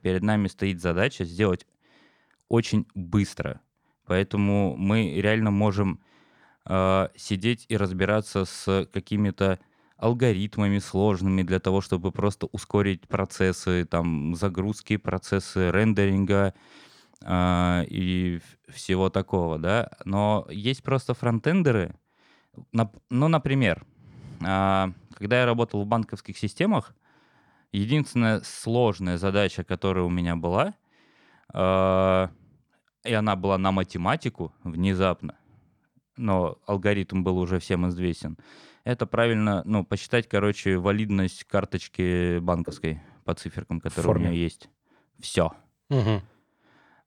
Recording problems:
none

